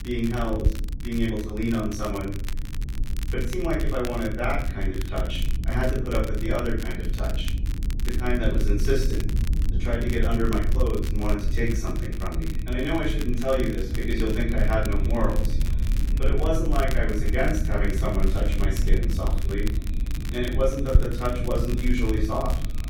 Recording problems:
off-mic speech; far
room echo; noticeable; dies away in 0.6 s
echo of what is said; faint; from 11 s on; 460 ms later, 25 dB below the speech
low rumble; noticeable; throughout; 15 dB below the speech
crackle, like an old record; noticeable; 15 dB below the speech

